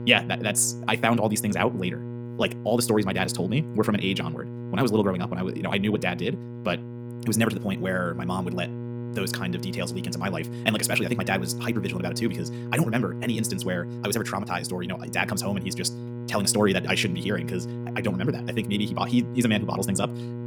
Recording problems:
wrong speed, natural pitch; too fast; 1.8 times normal speed
electrical hum; noticeable; throughout; 60 Hz, 15 dB below the speech

